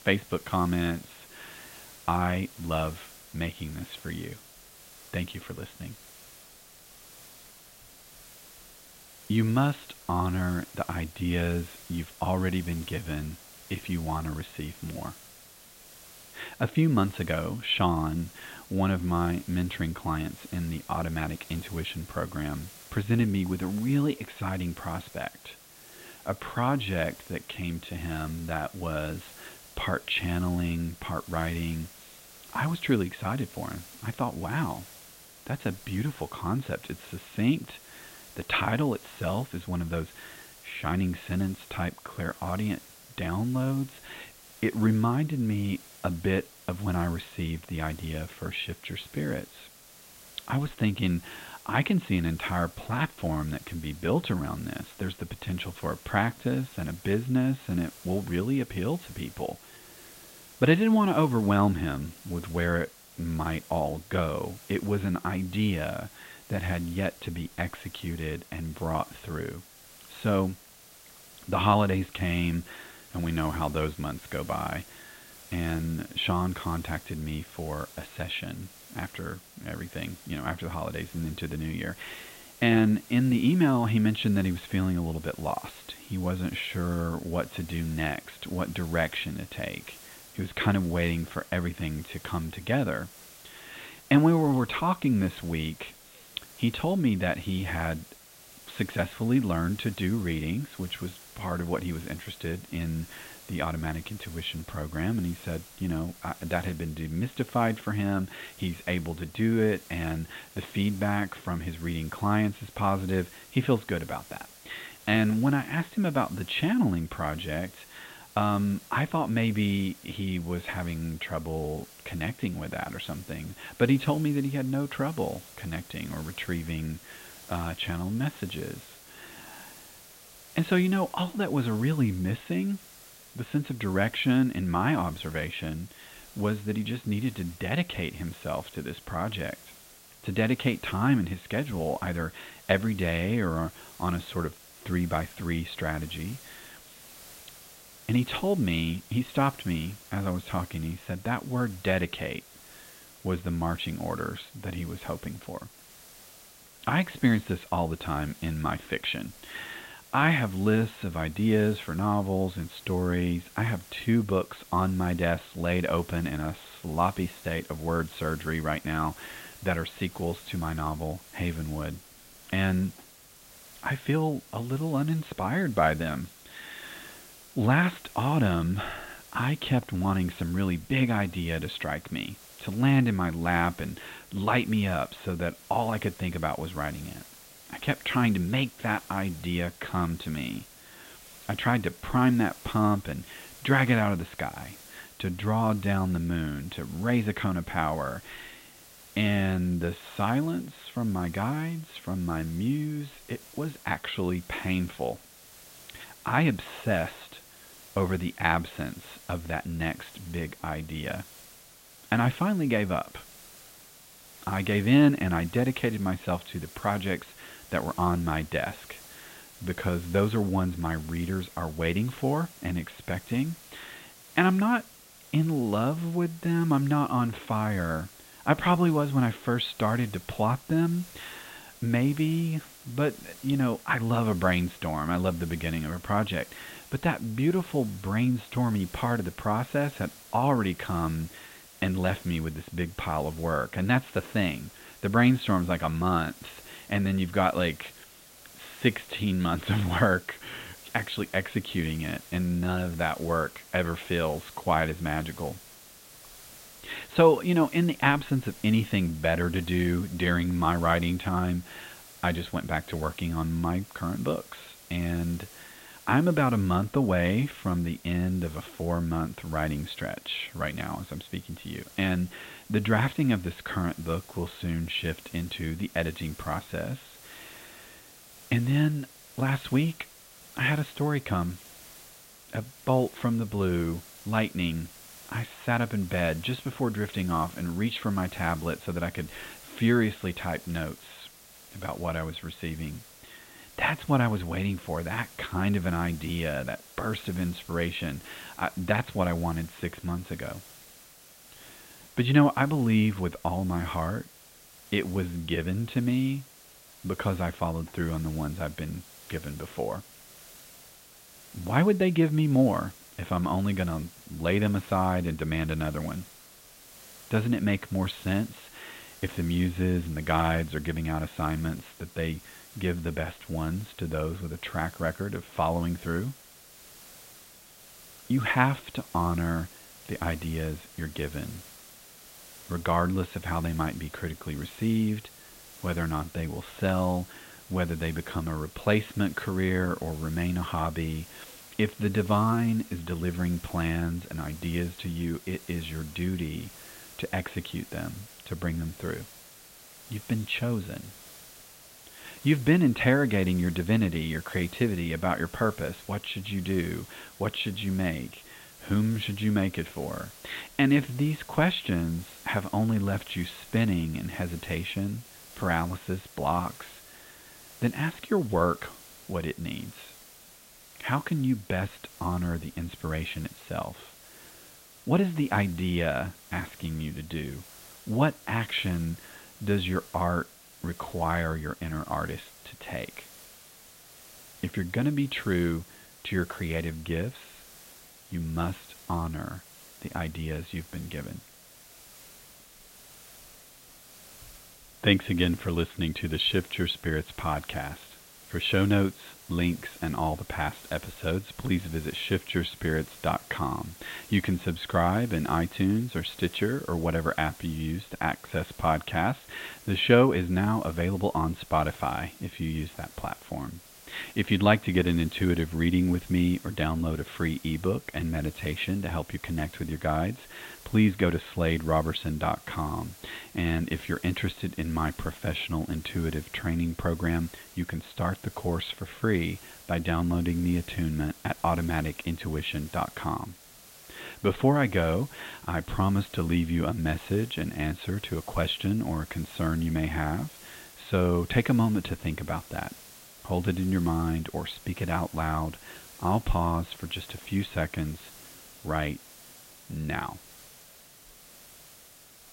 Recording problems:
high frequencies cut off; severe; nothing above 4 kHz
hiss; noticeable; throughout; 20 dB below the speech

